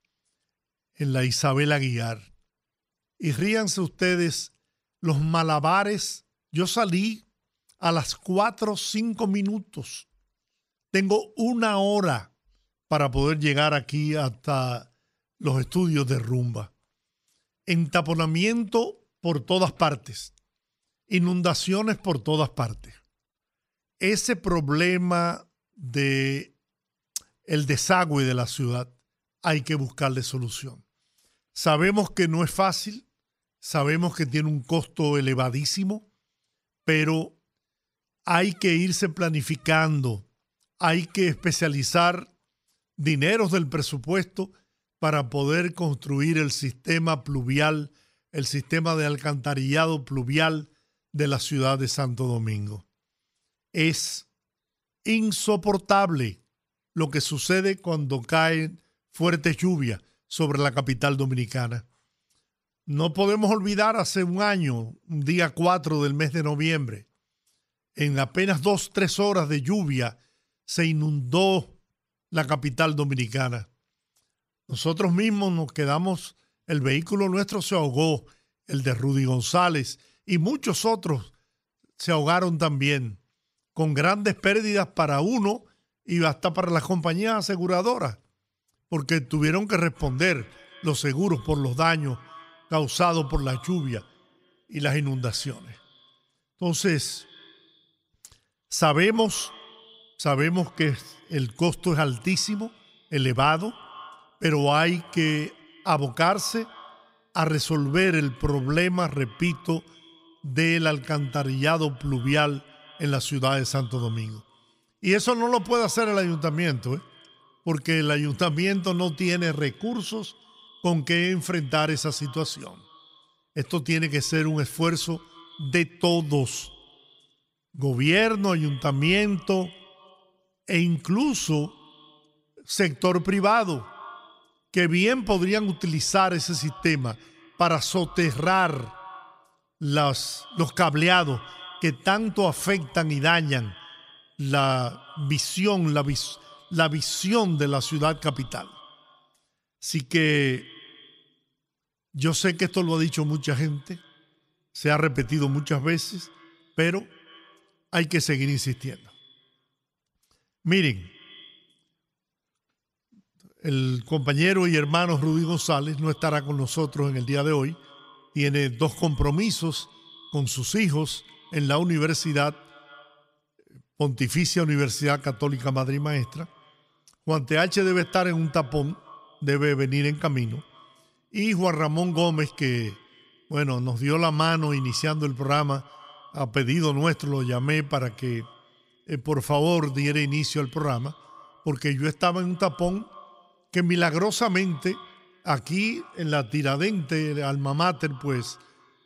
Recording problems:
echo of what is said; faint; from 1:30 on; 150 ms later, 25 dB below the speech

